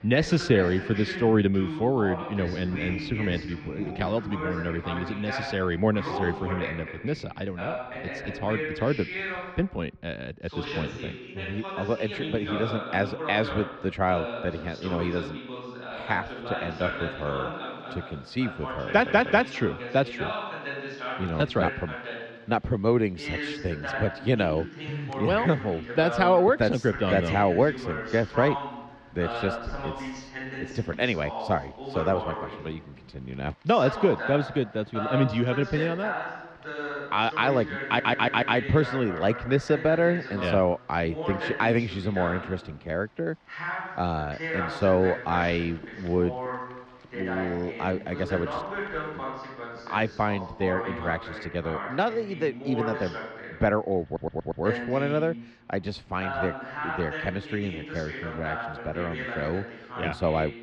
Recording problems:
muffled; slightly; fading above 3.5 kHz
voice in the background; loud; throughout; 7 dB below the speech
rain or running water; faint; throughout; 25 dB below the speech
audio stuttering; at 19 s, at 38 s and at 54 s

